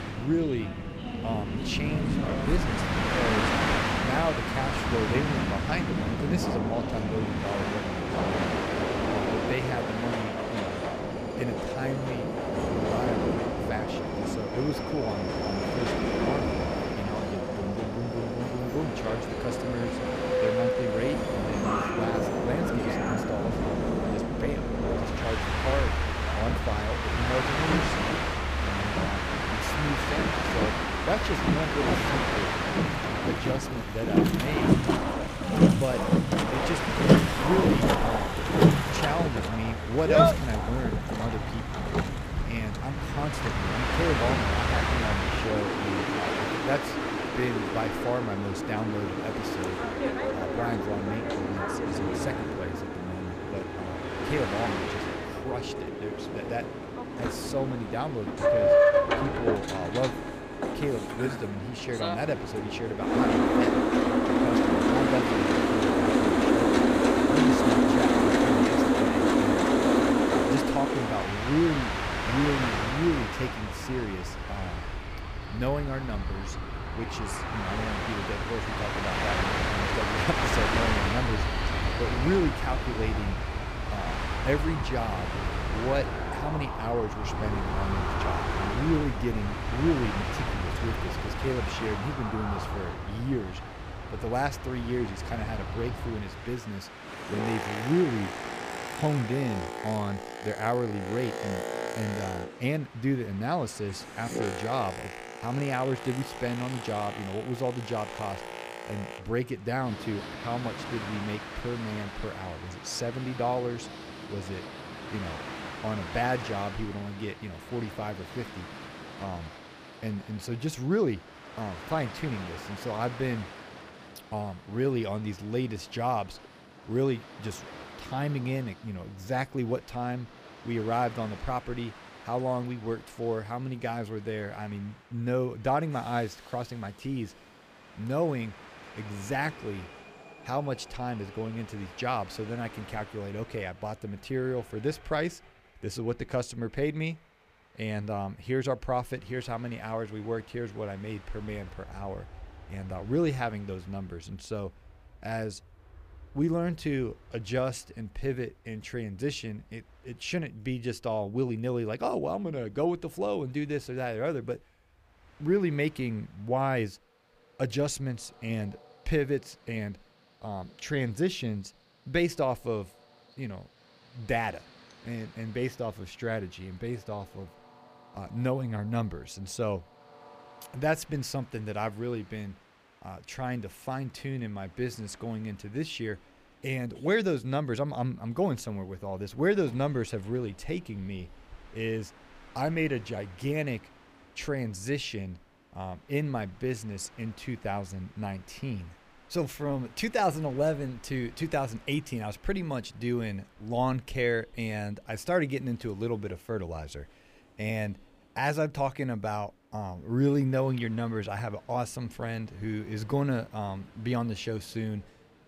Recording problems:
train or aircraft noise; very loud; throughout; 4 dB above the speech

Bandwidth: 15 kHz